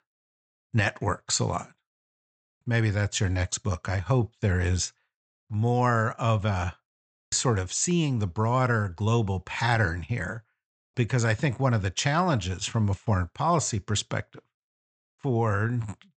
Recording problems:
high frequencies cut off; noticeable; nothing above 8 kHz

